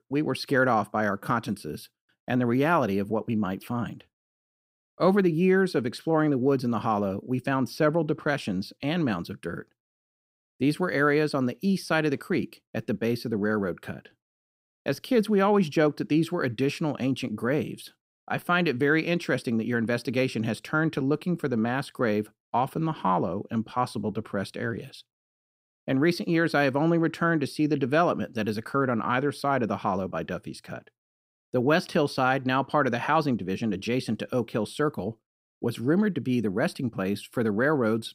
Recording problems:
none

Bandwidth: 15.5 kHz